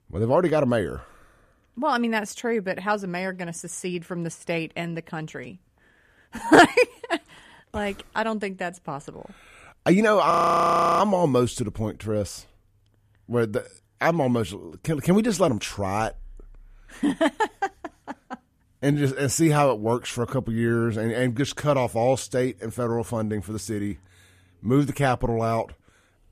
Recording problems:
audio freezing; at 10 s for 0.5 s

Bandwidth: 14.5 kHz